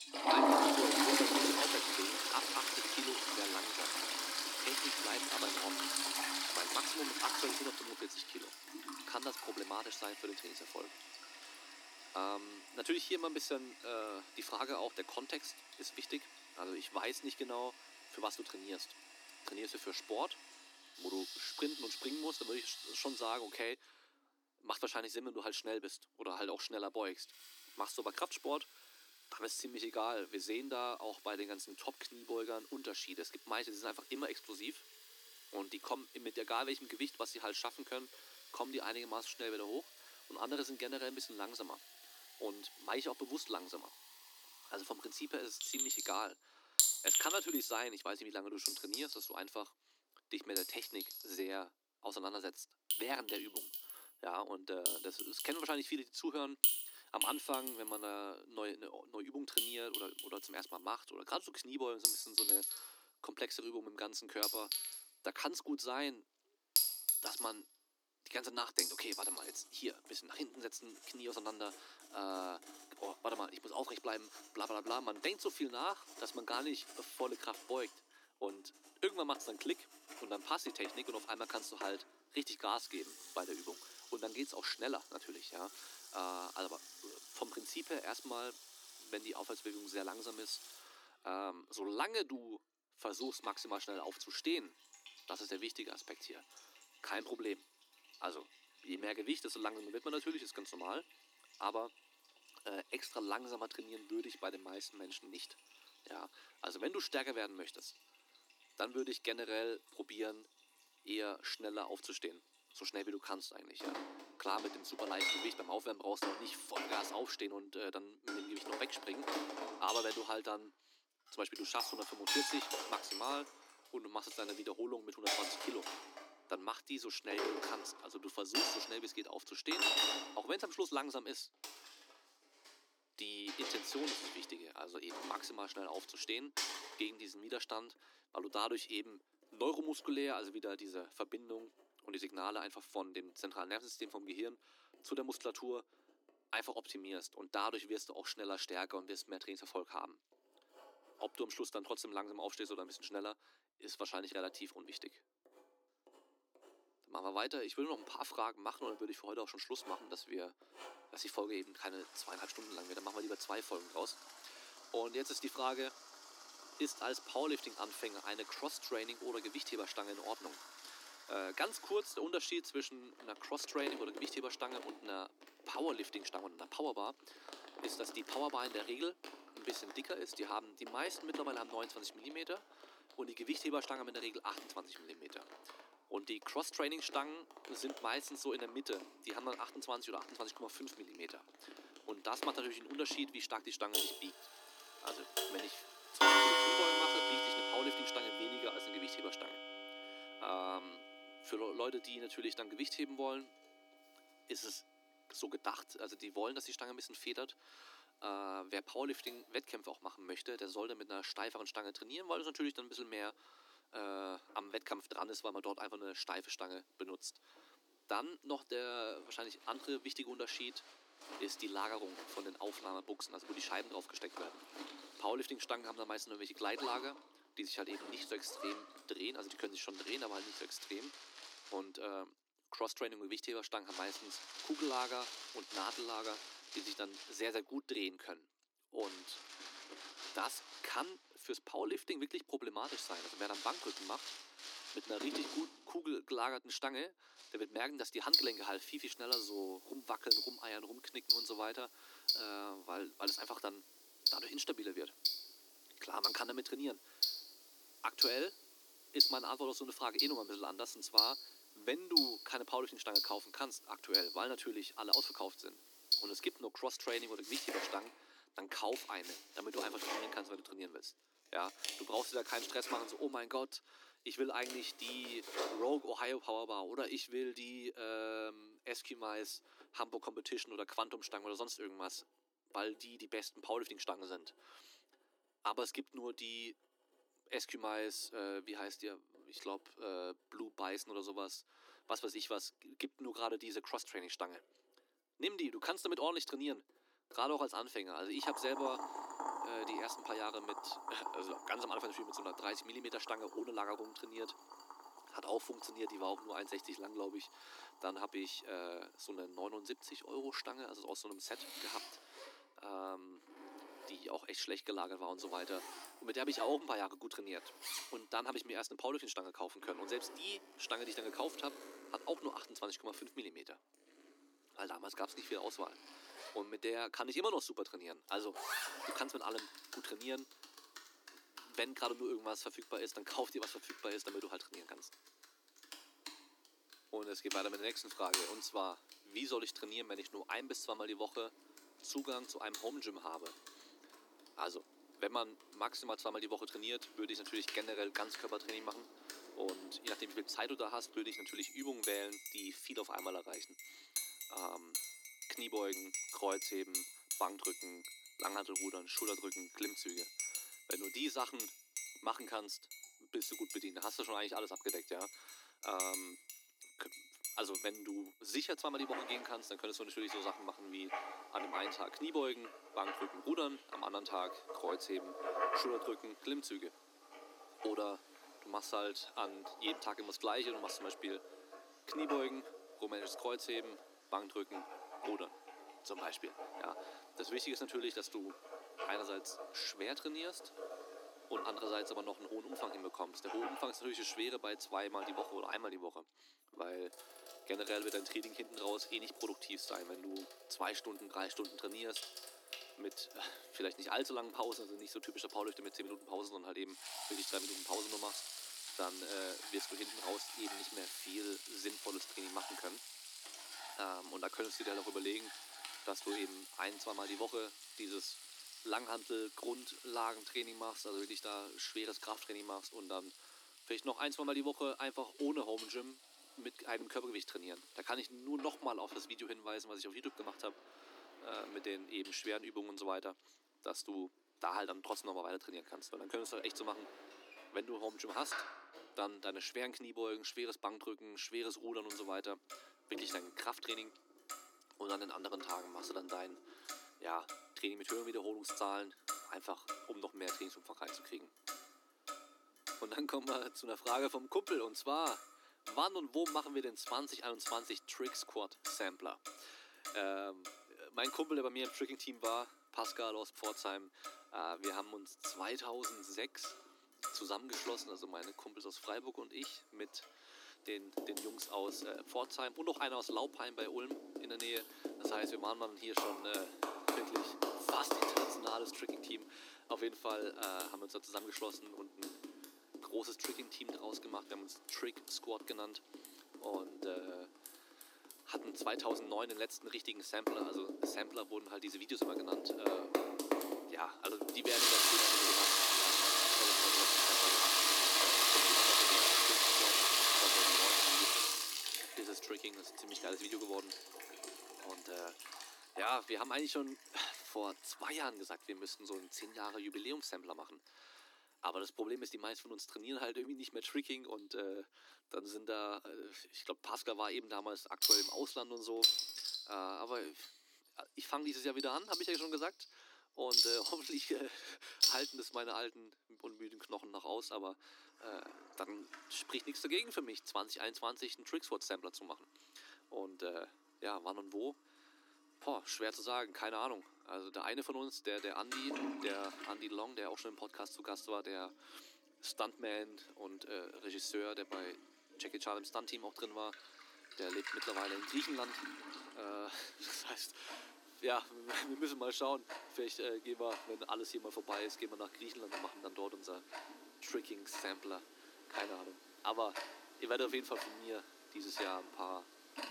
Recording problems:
thin; somewhat; fading below 300 Hz
household noises; very loud; throughout; 5 dB above the speech

